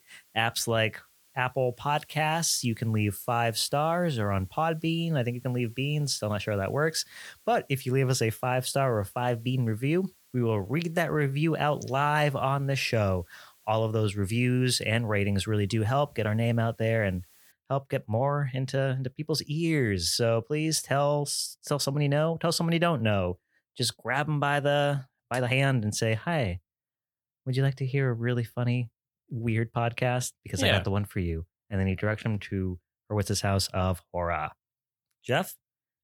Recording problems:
hiss; faint; until 18 s; 30 dB below the speech
uneven, jittery; strongly; from 10 to 33 s

